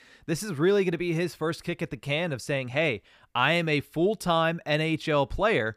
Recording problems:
none

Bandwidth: 15 kHz